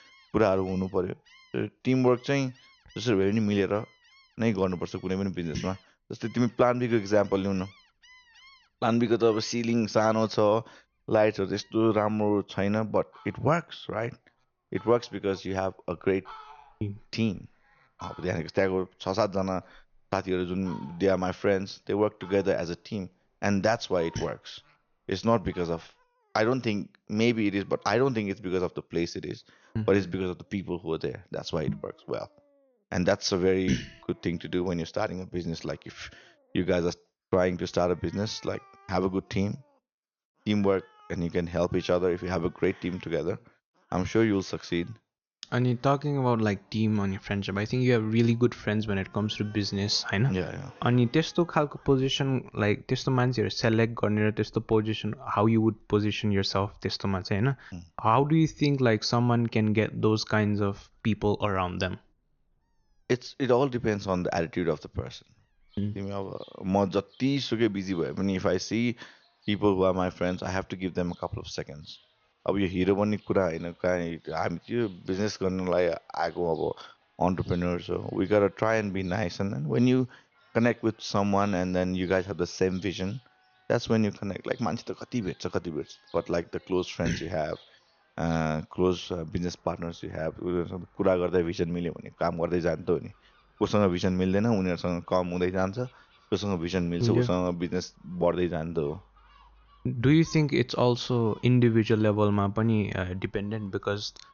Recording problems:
high frequencies cut off; noticeable; nothing above 6.5 kHz
animal sounds; faint; throughout; 30 dB below the speech

